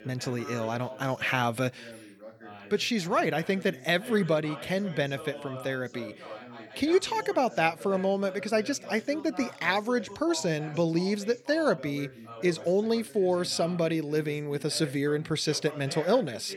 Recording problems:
background chatter; noticeable; throughout; 2 voices, 15 dB below the speech

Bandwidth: 18.5 kHz